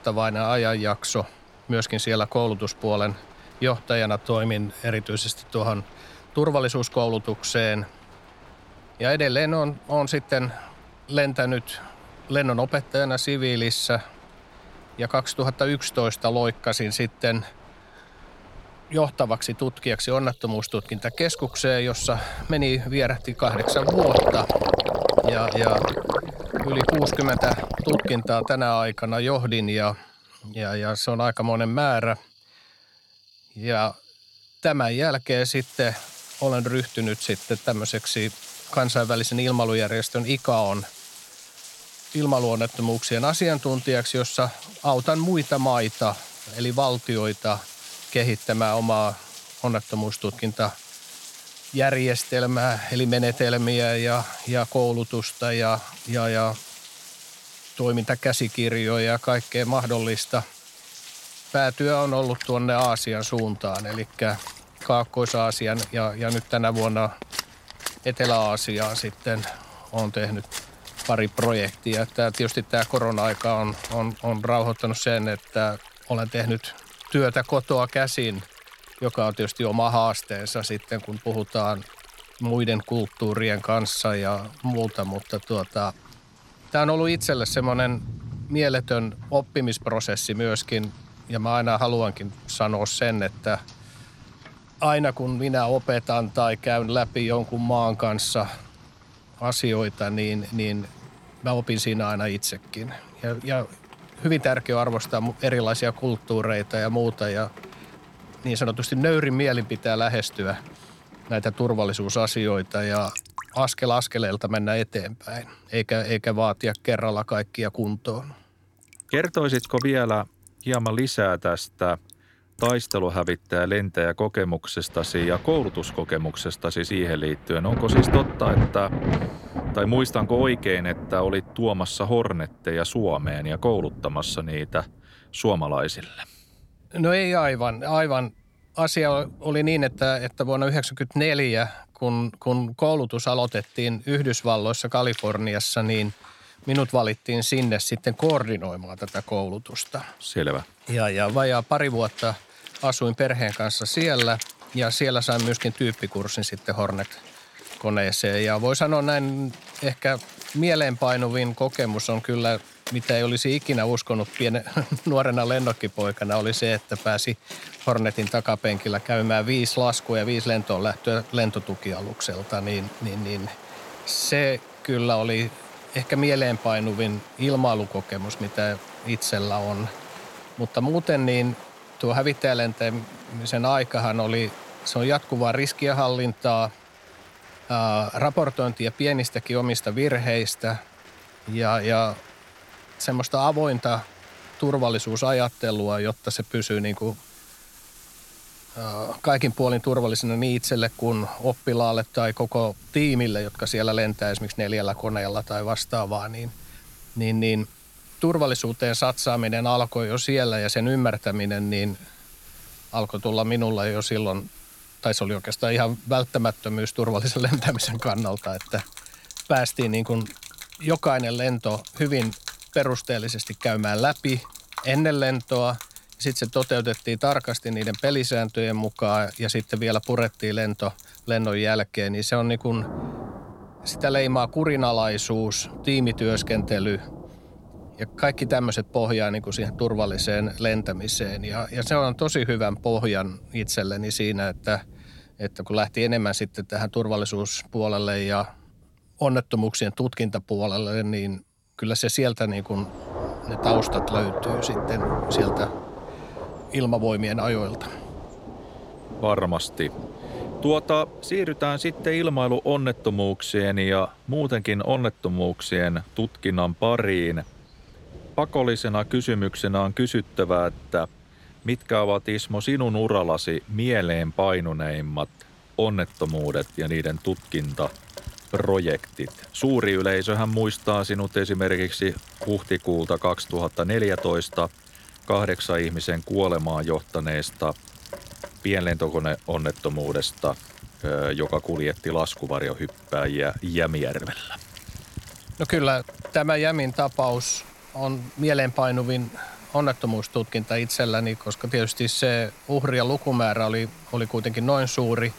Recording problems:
rain or running water; noticeable; throughout; 10 dB below the speech

